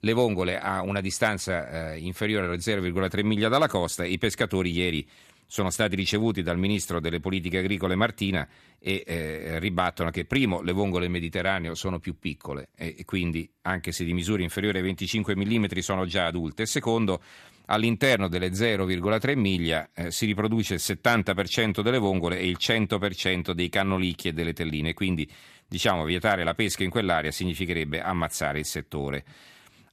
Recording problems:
none

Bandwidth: 14 kHz